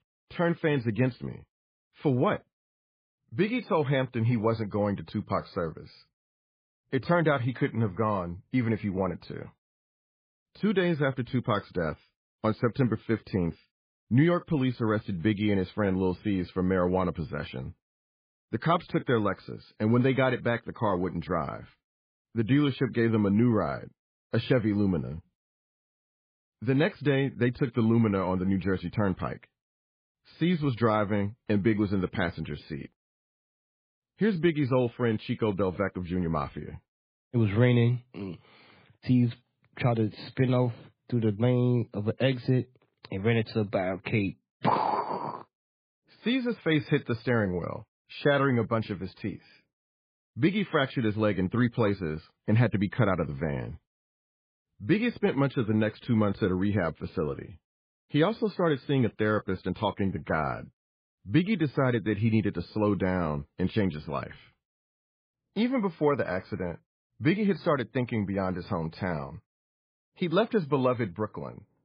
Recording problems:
garbled, watery; badly; nothing above 4.5 kHz
muffled; very slightly; fading above 4 kHz

